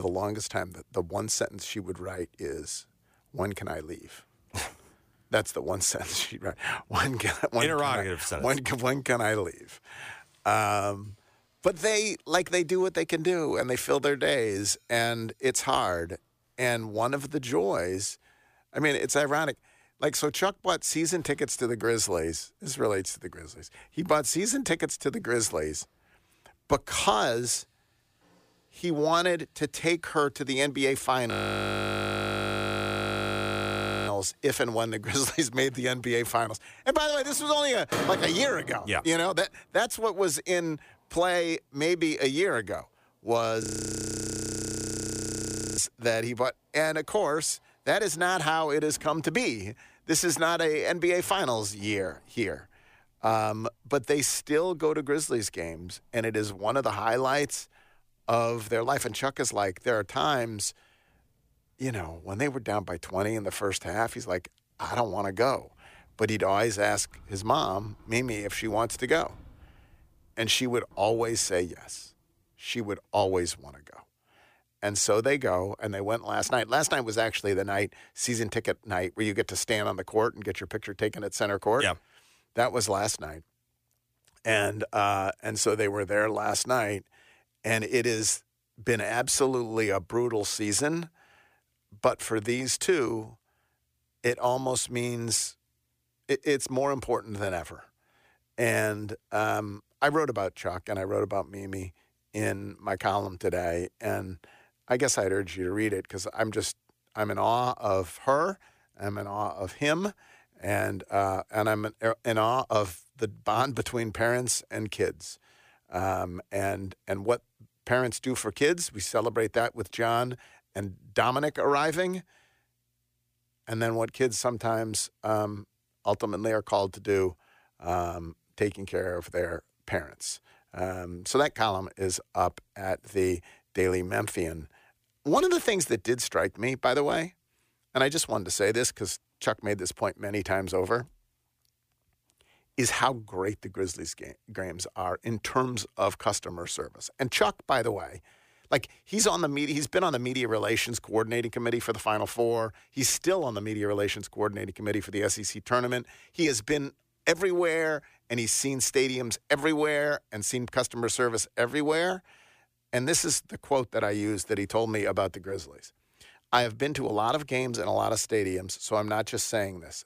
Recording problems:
household noises; noticeable; until 1:12; 15 dB below the speech
abrupt cut into speech; at the start
audio freezing; at 31 s for 3 s and at 44 s for 2 s

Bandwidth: 15 kHz